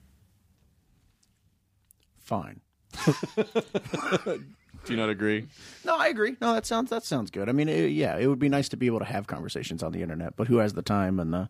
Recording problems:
none

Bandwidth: 15 kHz